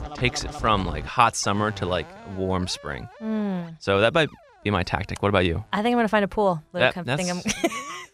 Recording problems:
background music; noticeable; throughout; 15 dB below the speech

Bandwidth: 15.5 kHz